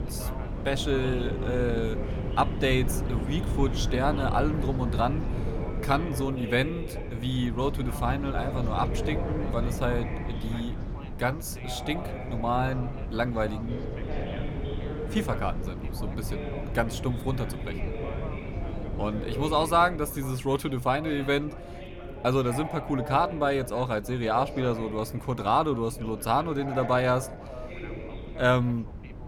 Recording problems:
background chatter; noticeable; throughout; 3 voices, 10 dB below the speech
wind noise on the microphone; occasional gusts; 15 dB below the speech

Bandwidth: 18 kHz